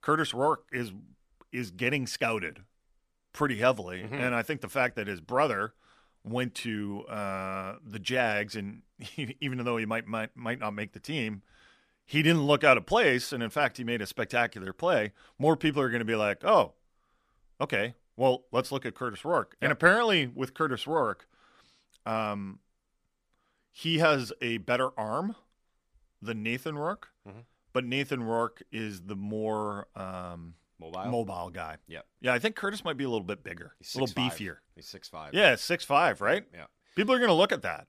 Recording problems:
none

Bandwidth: 14.5 kHz